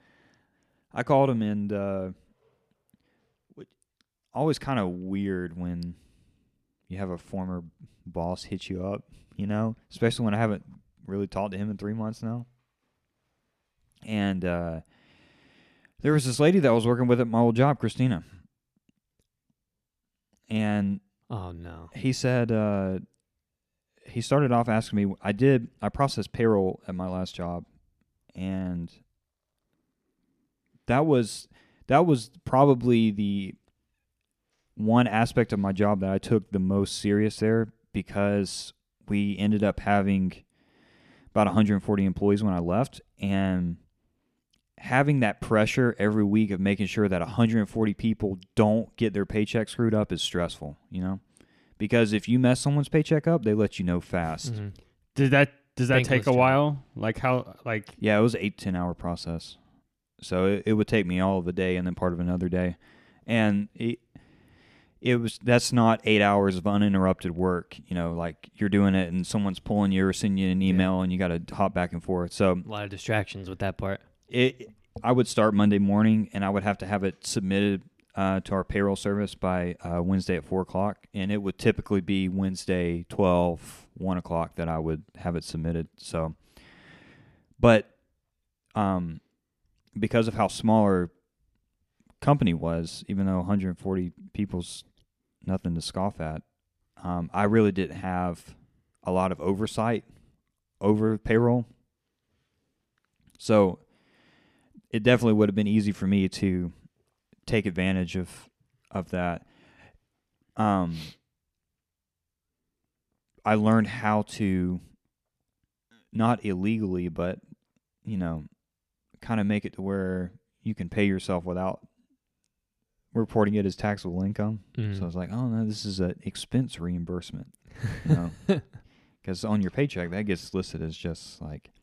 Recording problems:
none

